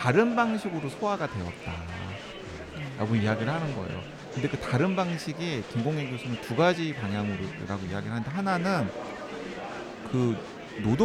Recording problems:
murmuring crowd; loud; throughout; 9 dB below the speech
abrupt cut into speech; at the start and the end

